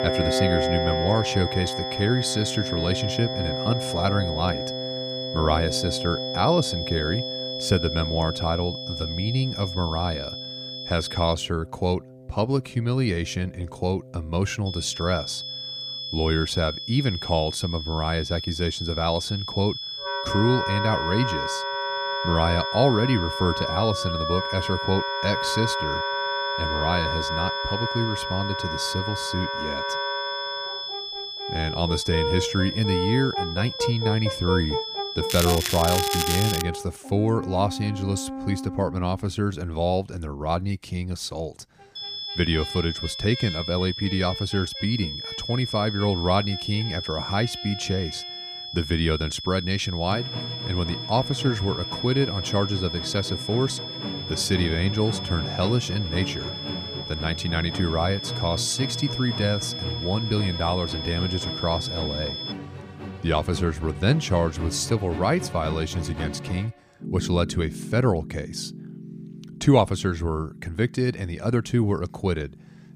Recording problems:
high-pitched whine; loud; until 11 s, from 15 to 37 s and from 42 s to 1:03; 3.5 kHz, 5 dB below the speech
background music; loud; throughout; 6 dB below the speech
crackling; loud; from 35 to 37 s; 2 dB below the speech

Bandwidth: 15 kHz